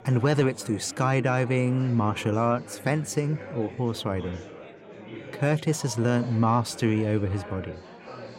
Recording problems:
chatter from many people; noticeable; throughout; 15 dB below the speech

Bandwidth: 16 kHz